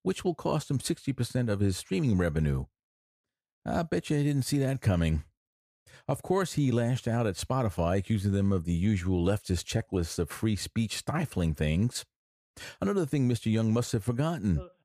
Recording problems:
none

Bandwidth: 15 kHz